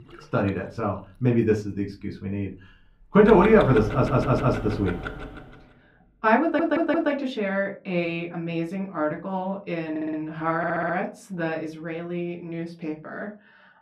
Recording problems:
muffled; very; fading above 3.5 kHz
room echo; very slight; dies away in 0.3 s
off-mic speech; somewhat distant
household noises; loud; until 5 s; 9 dB below the speech
audio stuttering; 4 times, first at 4 s

